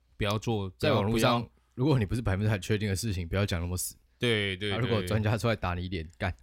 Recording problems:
none

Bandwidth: 16 kHz